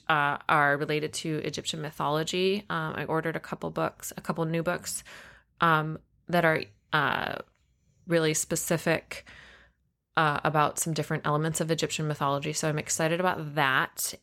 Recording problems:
none

